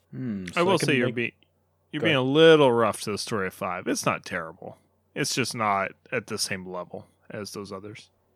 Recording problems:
none

